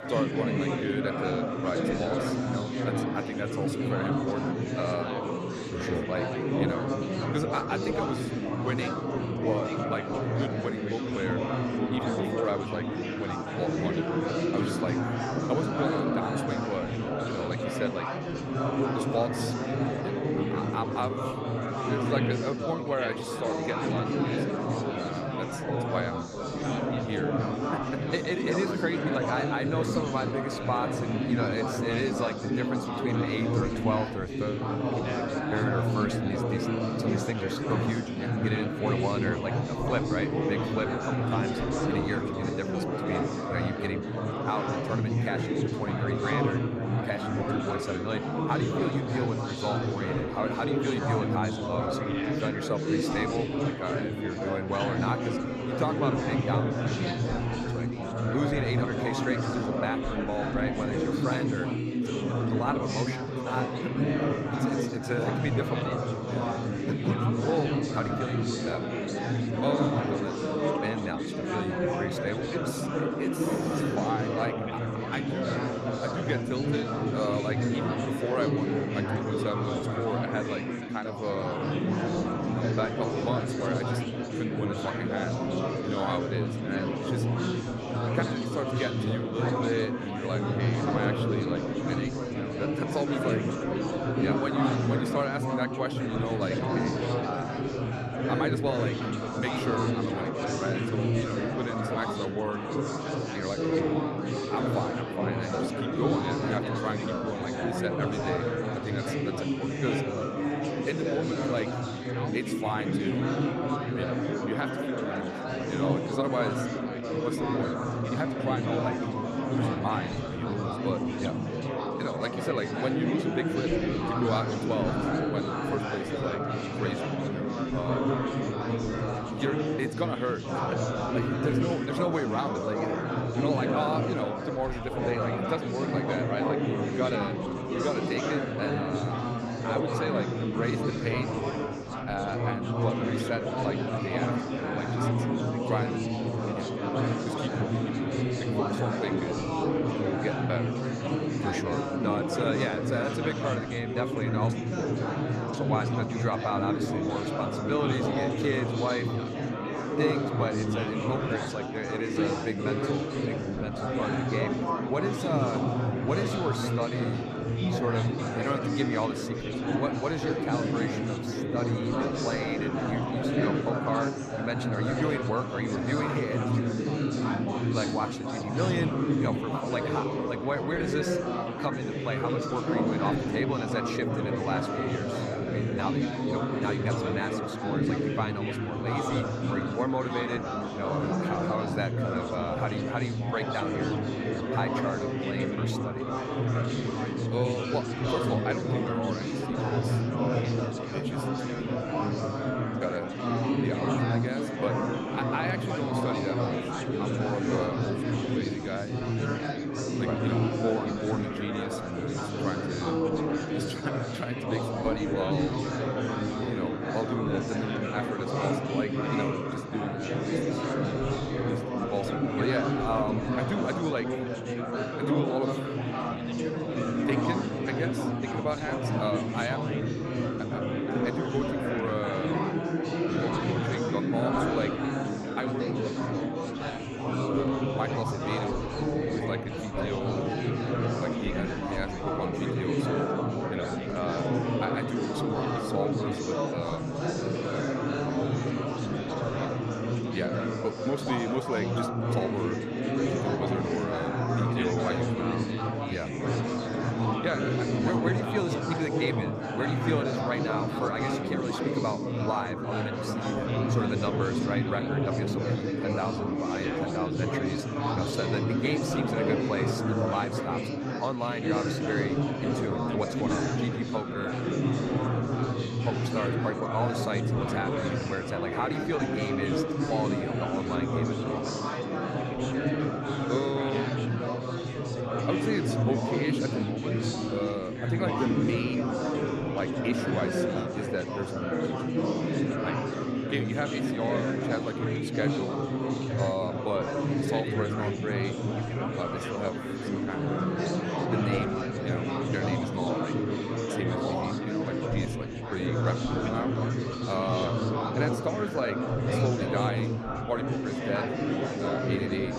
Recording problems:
chatter from many people; very loud; throughout; 4 dB above the speech

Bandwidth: 15 kHz